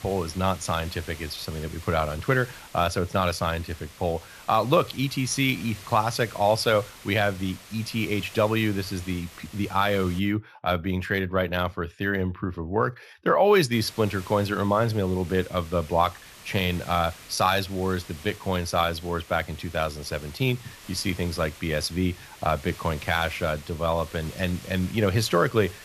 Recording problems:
hiss; noticeable; until 10 s and from 14 s on; 20 dB below the speech

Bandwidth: 14.5 kHz